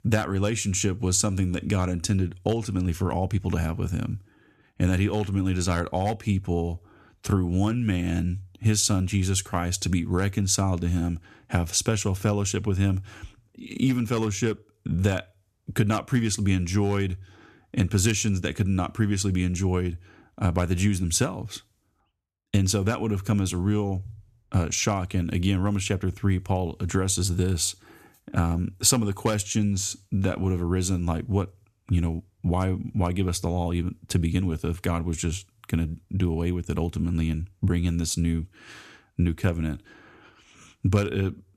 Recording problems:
none

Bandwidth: 14 kHz